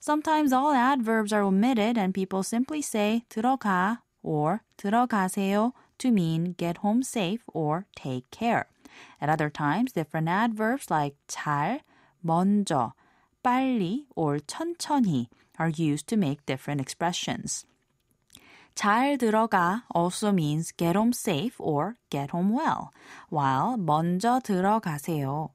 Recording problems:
none

